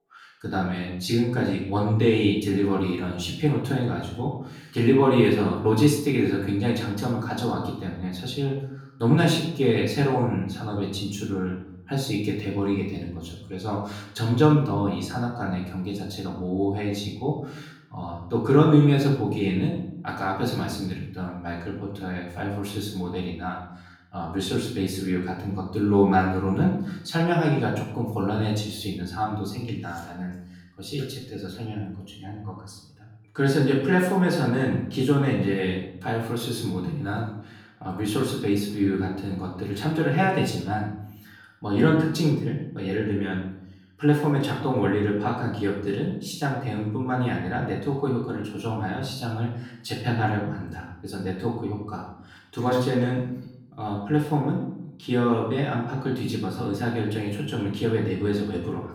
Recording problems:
off-mic speech; far
room echo; noticeable; dies away in 0.7 s

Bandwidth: 18.5 kHz